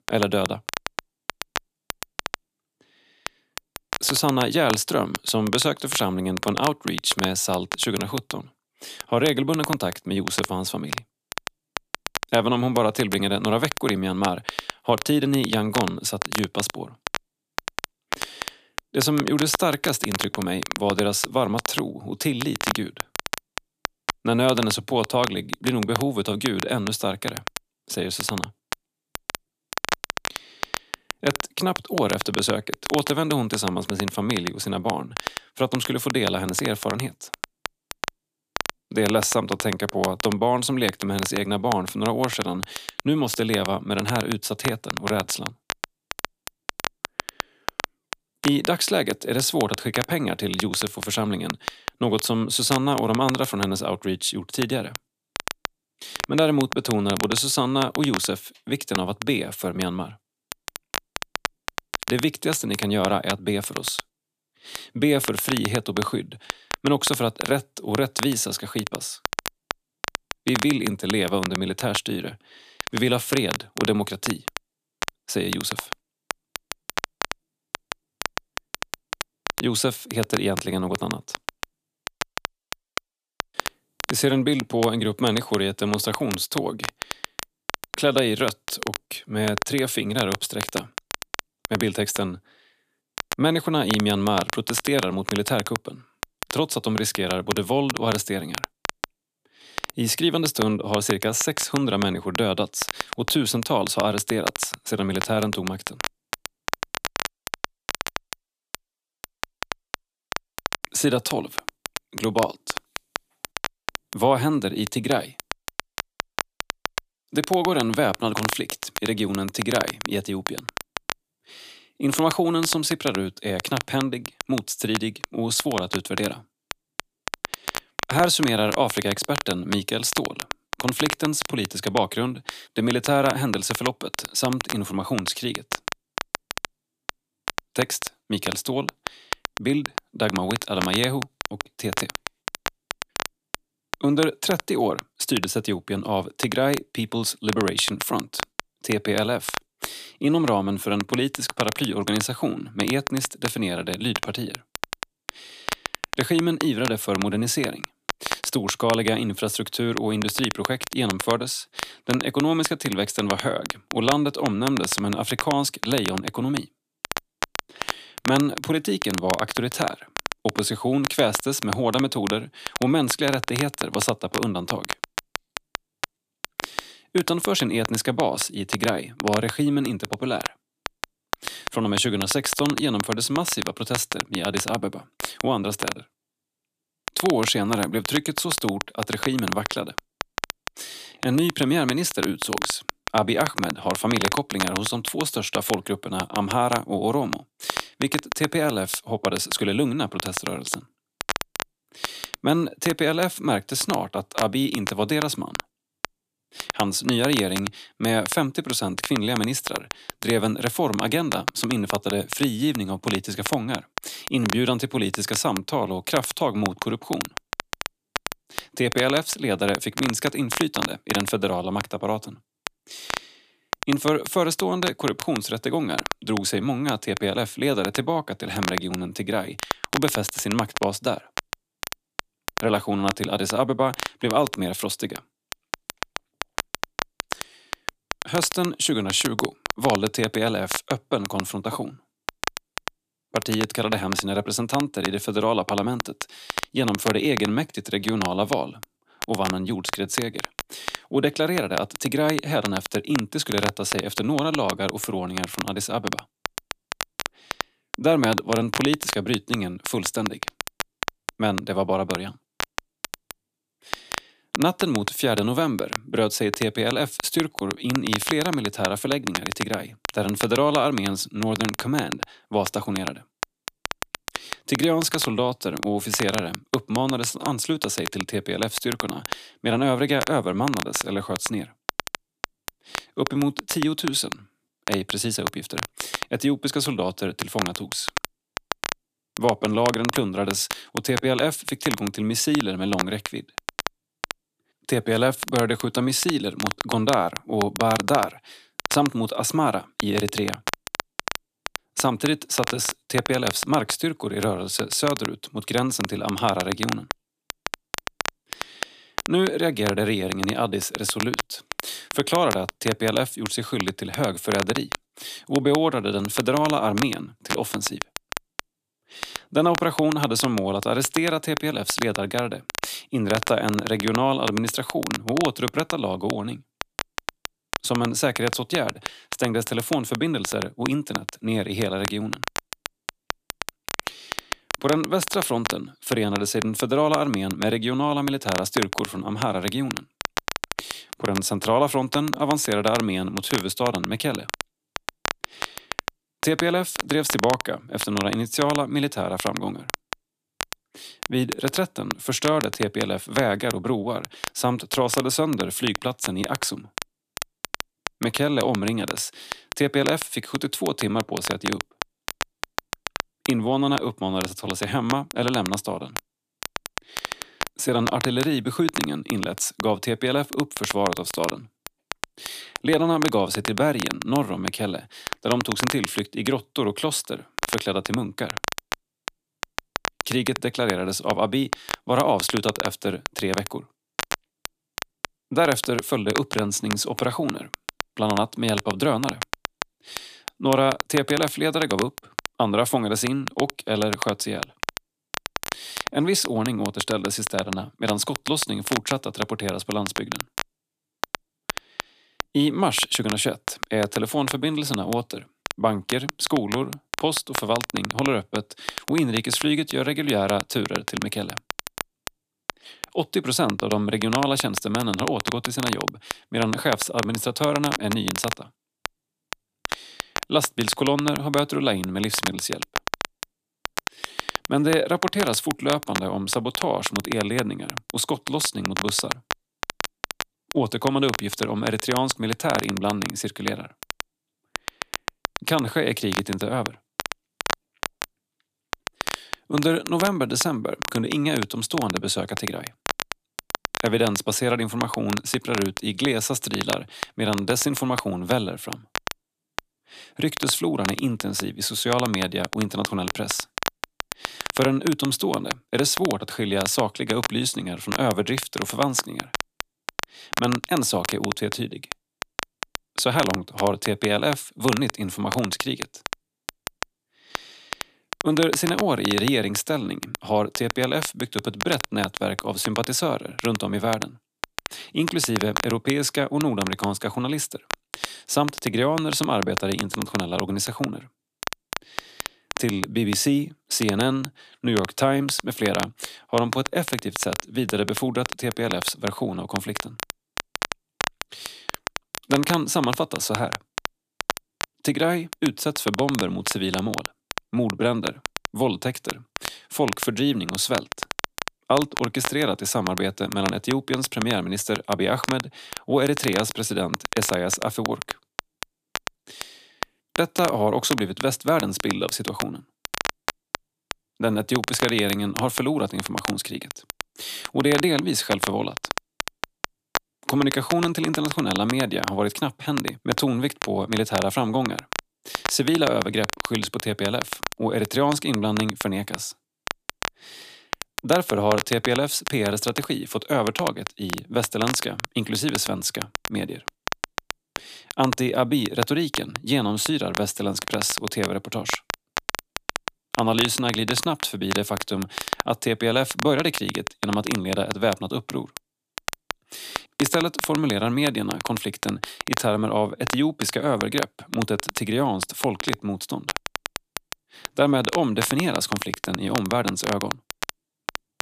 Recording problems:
crackle, like an old record; loud; 7 dB below the speech

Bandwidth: 14.5 kHz